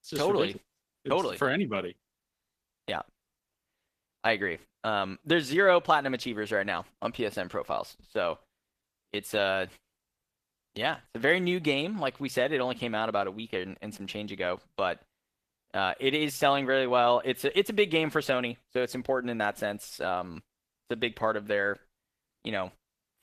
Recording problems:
garbled, watery; slightly; nothing above 14.5 kHz

